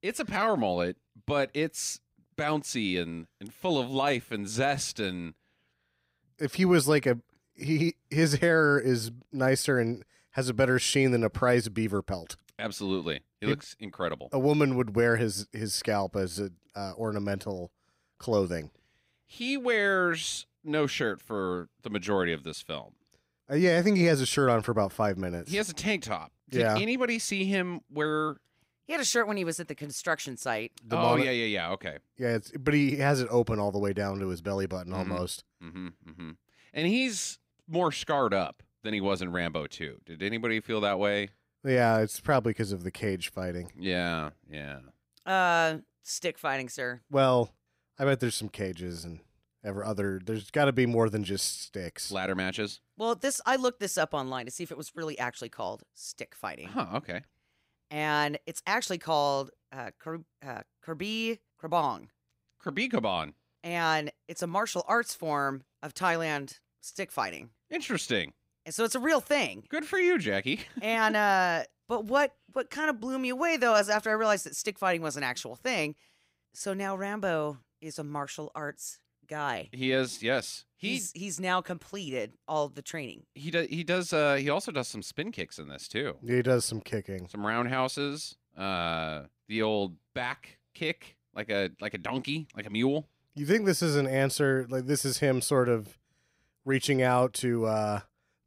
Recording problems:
none

